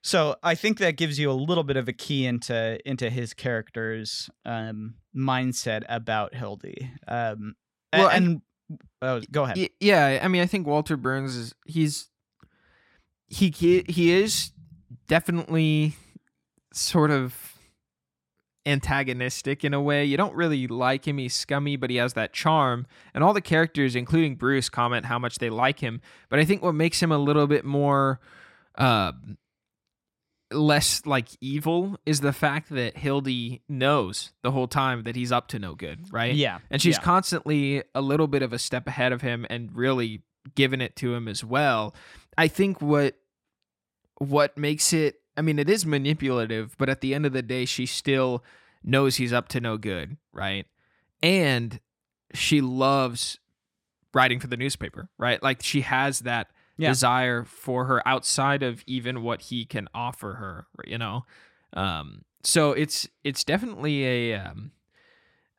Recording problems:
none

